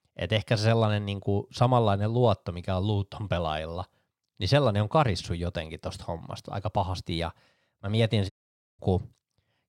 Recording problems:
audio cutting out; at 8.5 s

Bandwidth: 16.5 kHz